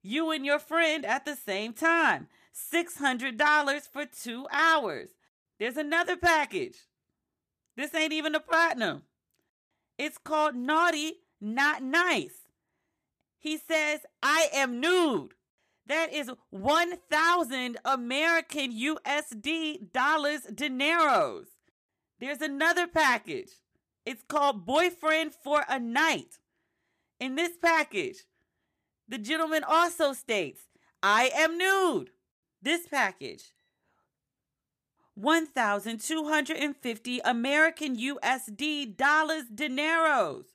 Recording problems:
none

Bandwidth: 14.5 kHz